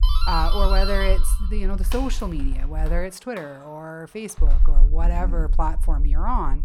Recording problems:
low rumble; noticeable; until 3 s and from 4.5 s on; 20 dB below the speech
doorbell; loud; until 4.5 s; peak level with the speech

